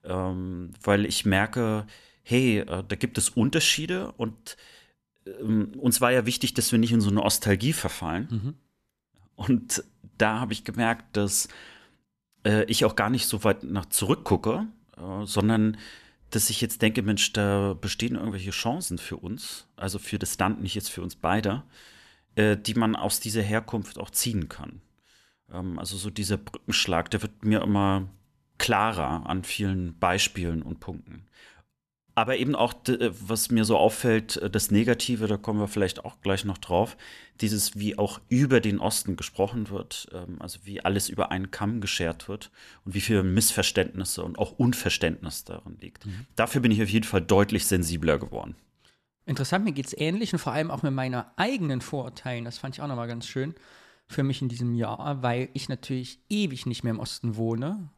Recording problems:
none

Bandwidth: 14 kHz